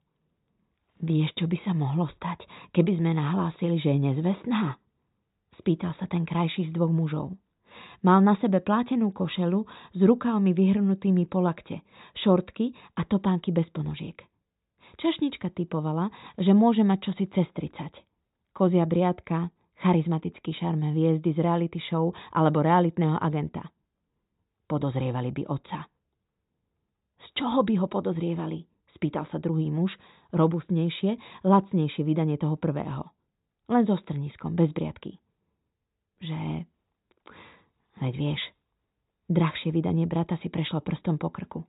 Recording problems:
high frequencies cut off; severe; nothing above 4 kHz

